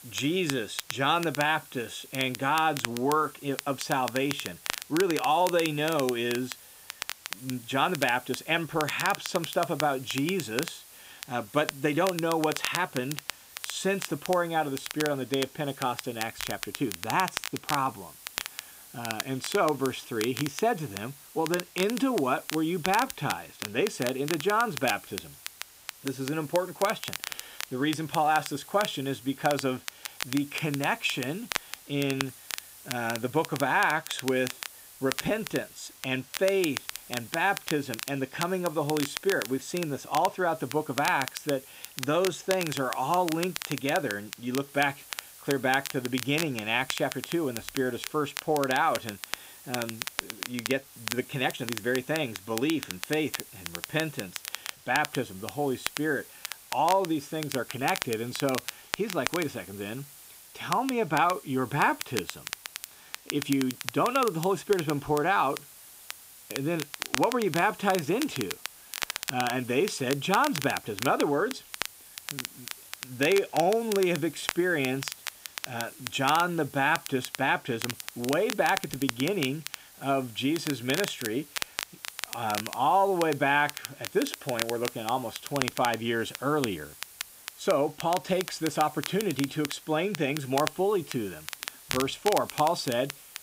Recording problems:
crackle, like an old record; loud; 8 dB below the speech
hiss; noticeable; throughout; 20 dB below the speech

